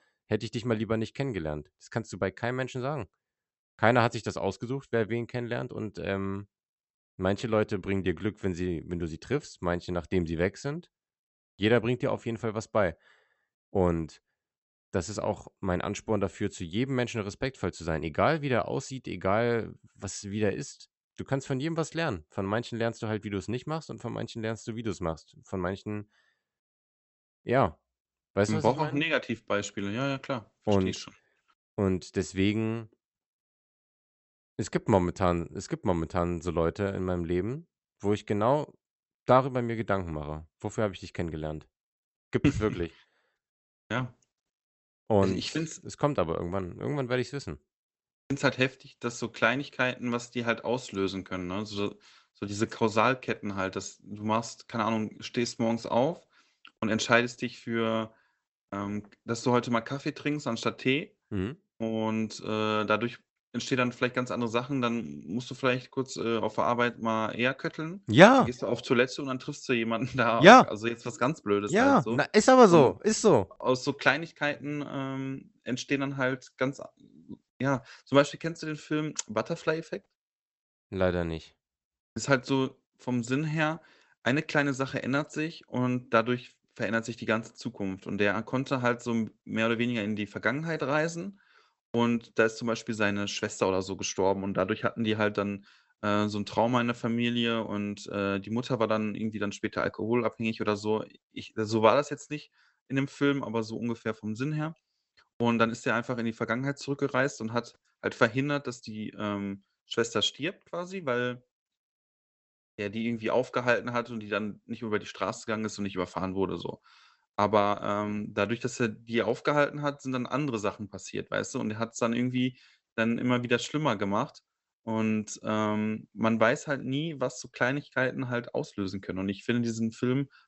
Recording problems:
high frequencies cut off; noticeable; nothing above 8 kHz

